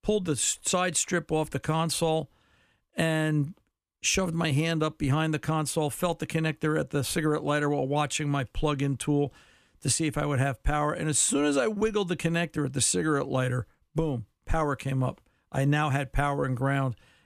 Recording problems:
none

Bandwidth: 14.5 kHz